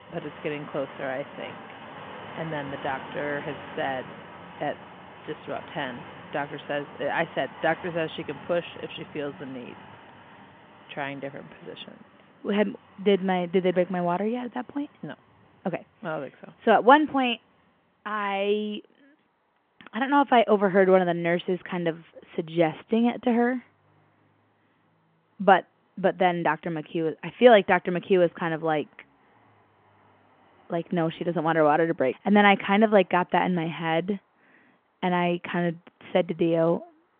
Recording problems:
phone-call audio
traffic noise; noticeable; throughout; 20 dB below the speech

